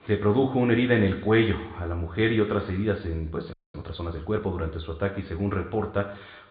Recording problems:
high frequencies cut off; severe; nothing above 4.5 kHz
room echo; slight; dies away in 0.8 s
off-mic speech; somewhat distant
audio freezing; at 3.5 s

